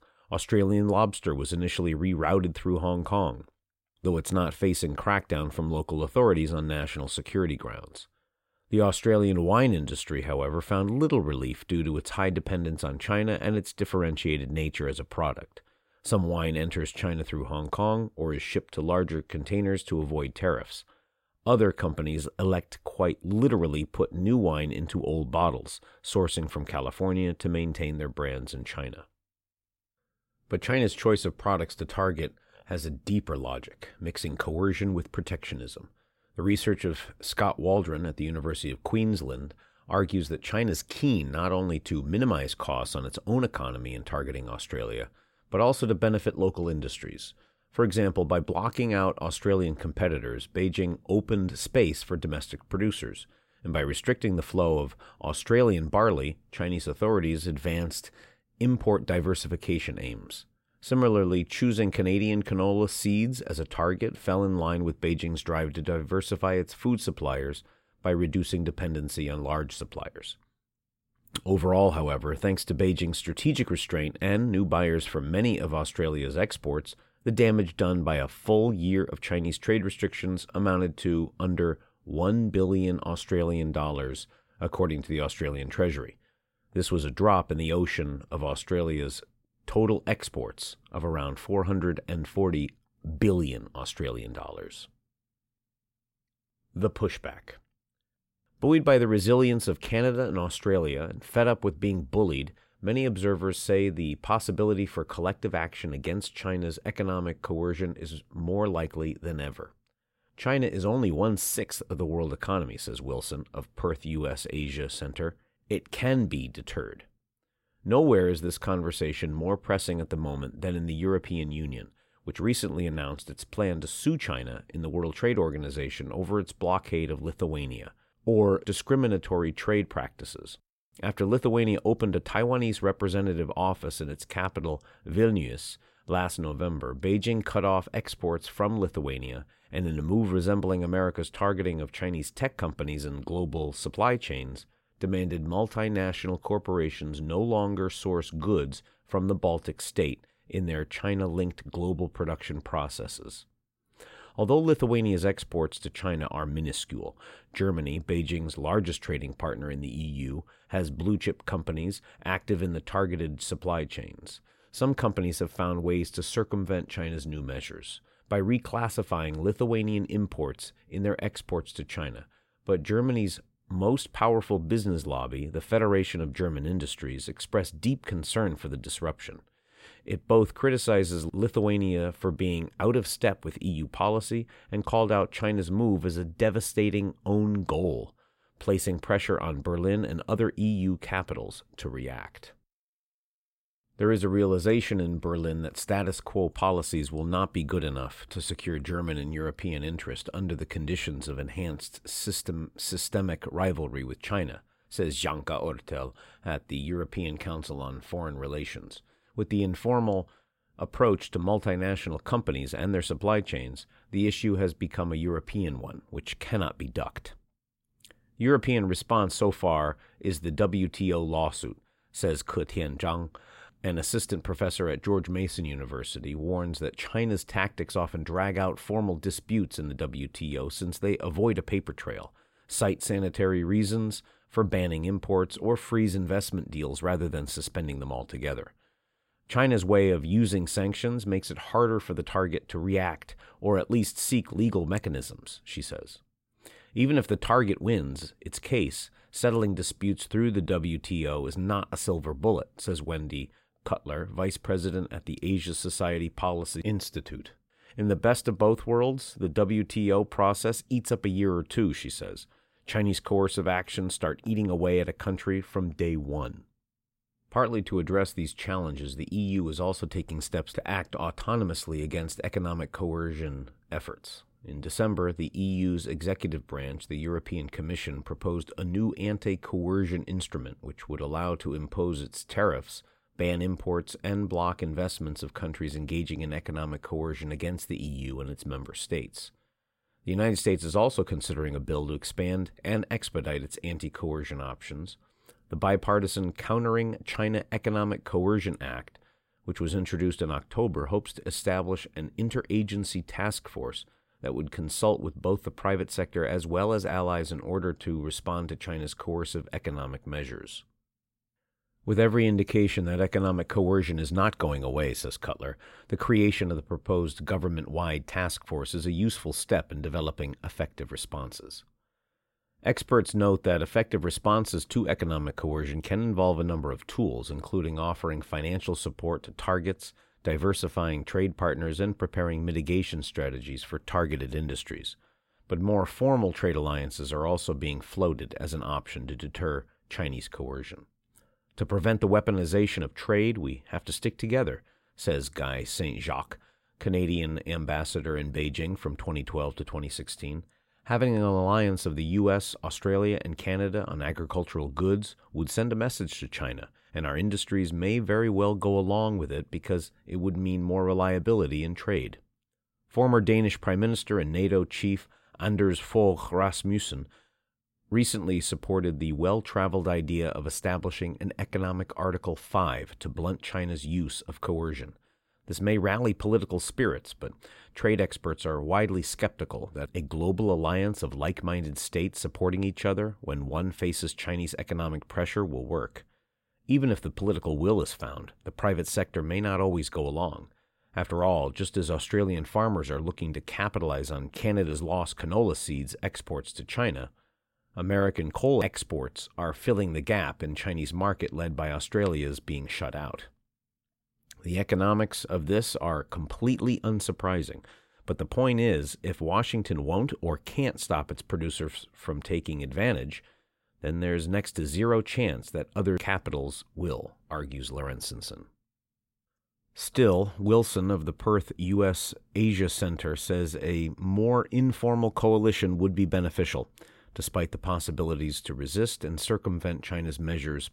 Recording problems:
none

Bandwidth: 16 kHz